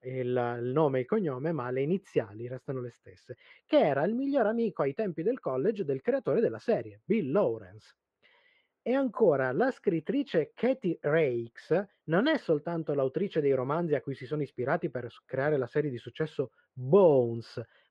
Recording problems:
muffled; very; fading above 2 kHz

